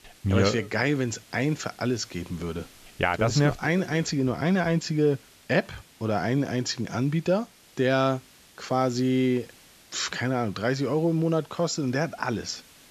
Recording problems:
high frequencies cut off; noticeable; nothing above 8 kHz
hiss; faint; throughout; 25 dB below the speech

